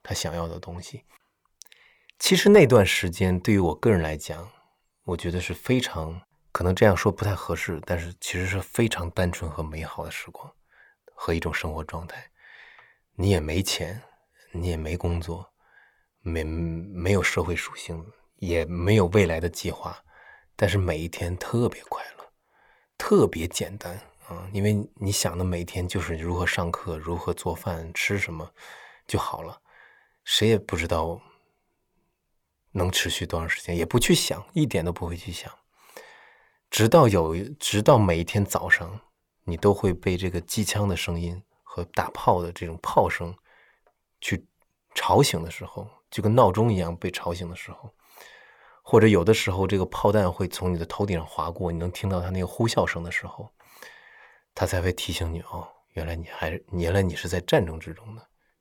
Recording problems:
none

